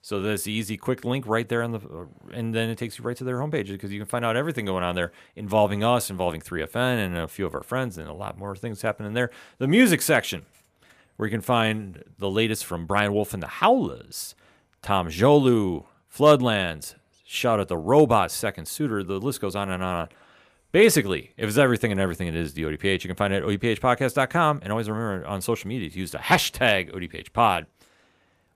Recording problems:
none

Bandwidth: 15 kHz